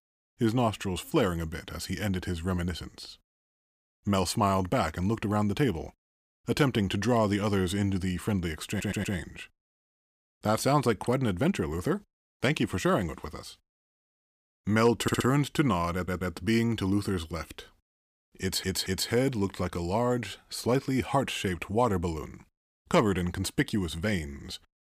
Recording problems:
audio stuttering; 4 times, first at 8.5 s

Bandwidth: 15 kHz